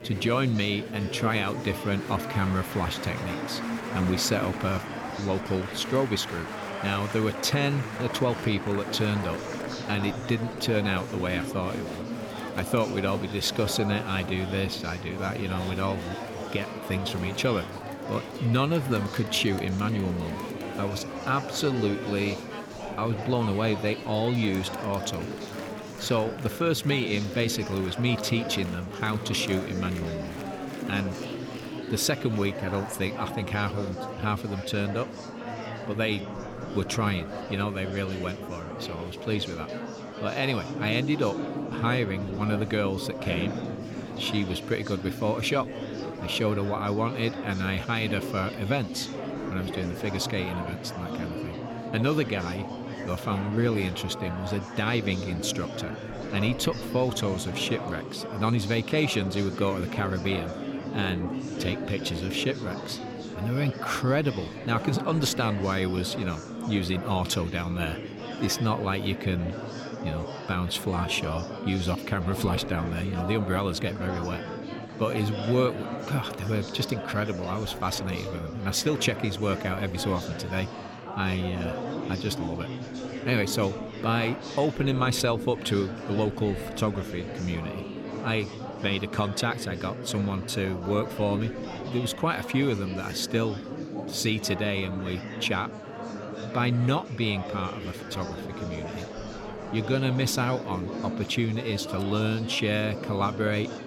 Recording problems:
murmuring crowd; loud; throughout; 7 dB below the speech

